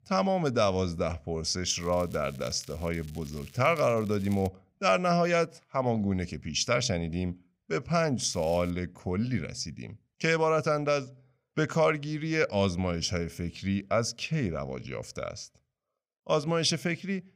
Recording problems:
crackling; faint; from 1.5 to 4.5 s and at 8 s; 25 dB below the speech

